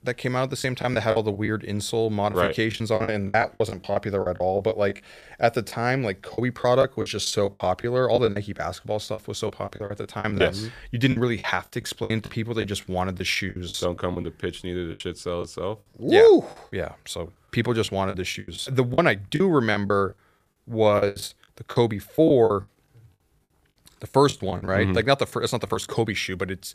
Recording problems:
choppy; very; 12% of the speech affected

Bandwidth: 14.5 kHz